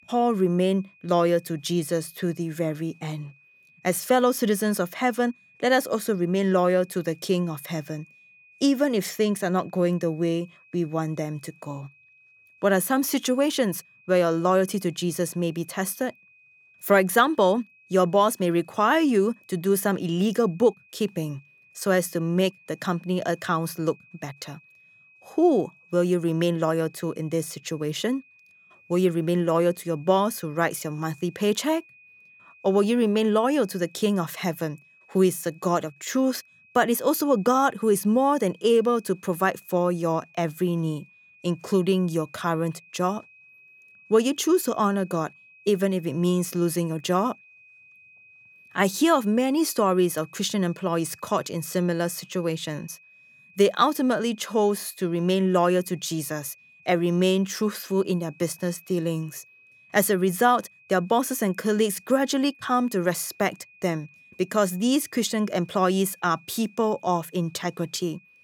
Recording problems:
high-pitched whine; faint; throughout; 2.5 kHz, 30 dB below the speech

